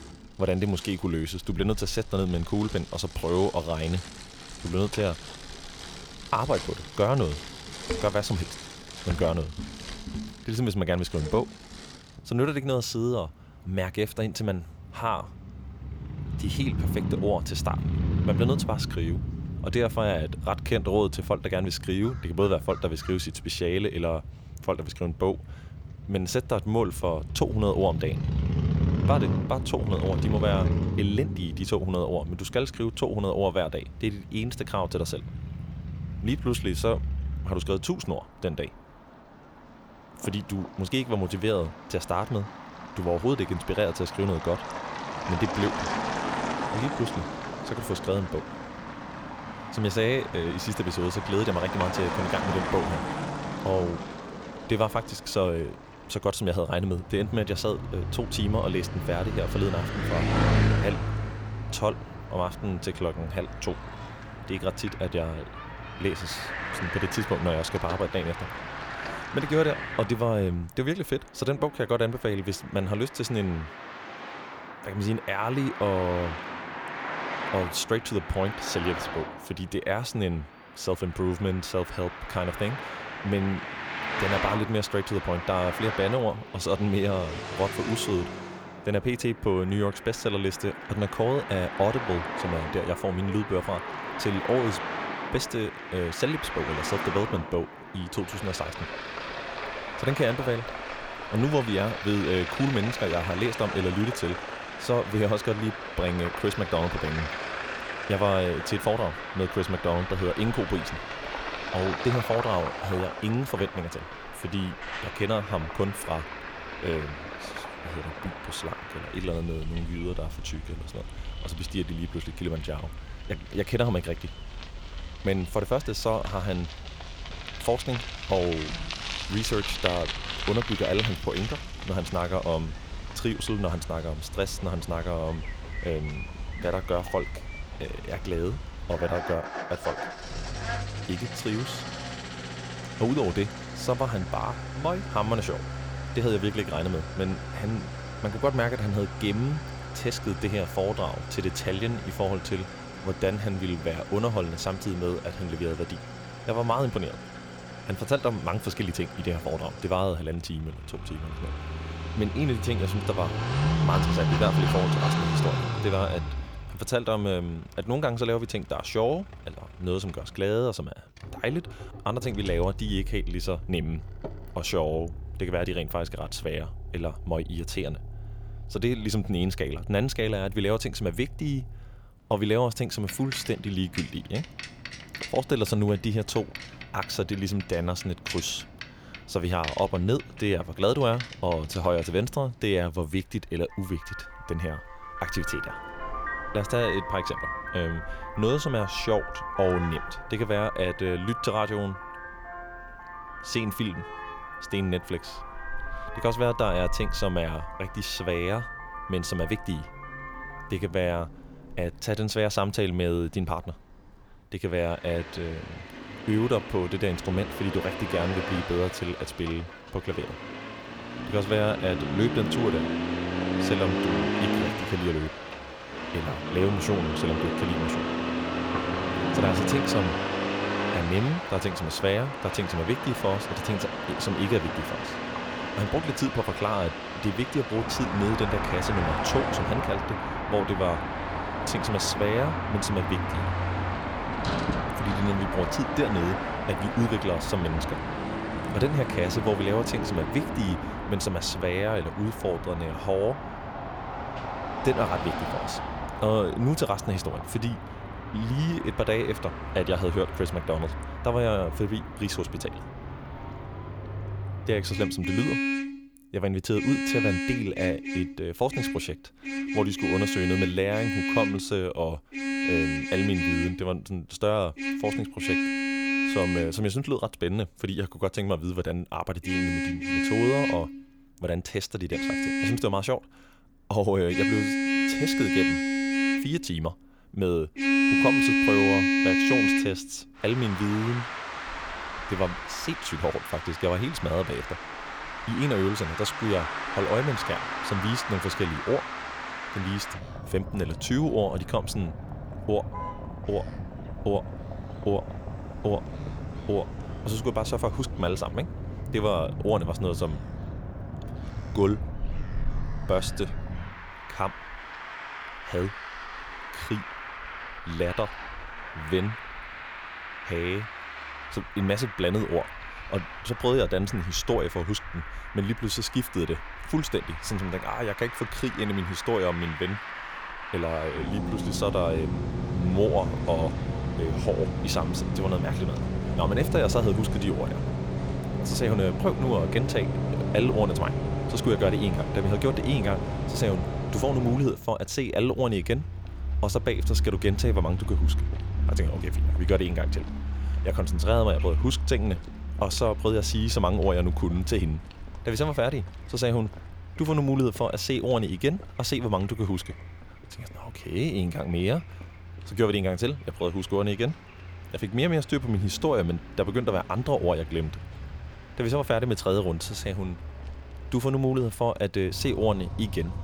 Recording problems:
traffic noise; loud; throughout; 4 dB below the speech

